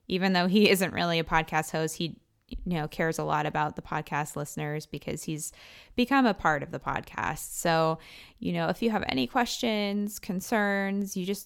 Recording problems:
none

